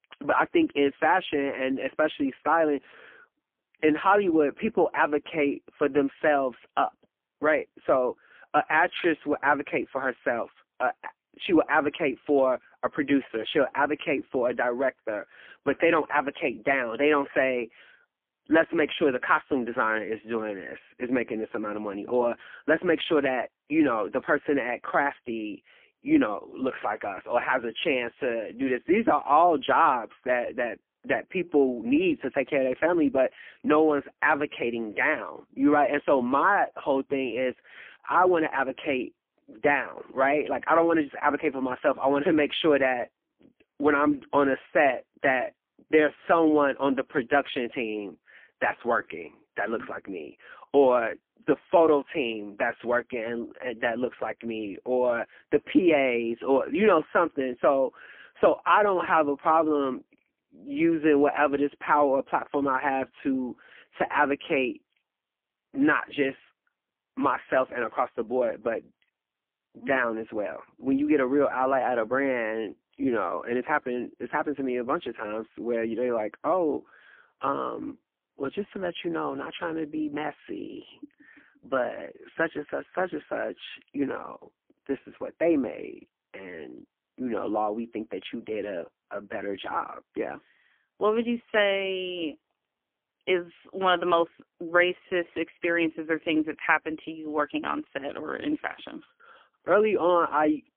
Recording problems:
phone-call audio; poor line; nothing above 3.5 kHz

